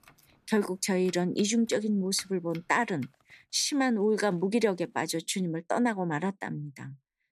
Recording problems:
household noises; faint; until 5 s; 25 dB below the speech

